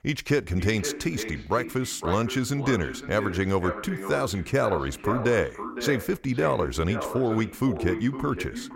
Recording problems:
echo of what is said; strong; throughout; 510 ms later, 9 dB below the speech

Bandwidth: 16 kHz